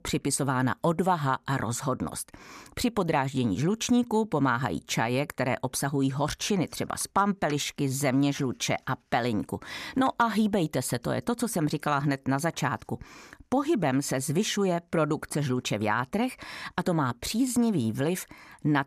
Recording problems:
none

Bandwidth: 14.5 kHz